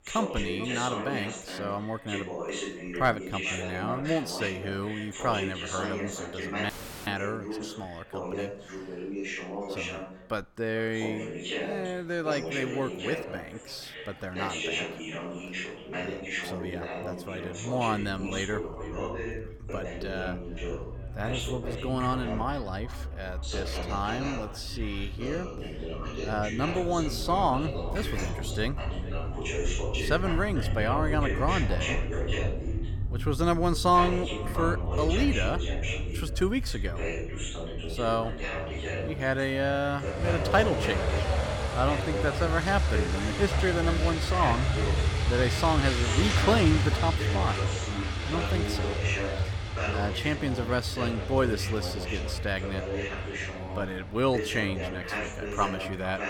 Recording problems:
echo of what is said; noticeable; throughout; 440 ms later, 15 dB below the speech
traffic noise; loud; throughout; 2 dB below the speech
voice in the background; loud; throughout; 5 dB below the speech
crackling; faint; at 28 s; 25 dB below the speech
audio cutting out; at 6.5 s

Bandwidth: 17.5 kHz